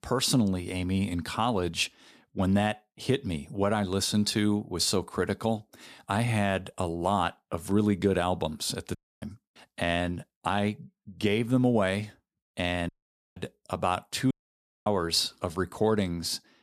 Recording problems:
audio cutting out; at 9 s, at 13 s and at 14 s for 0.5 s

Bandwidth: 14.5 kHz